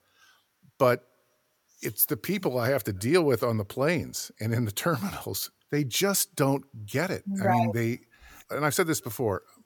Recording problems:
none

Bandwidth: 18.5 kHz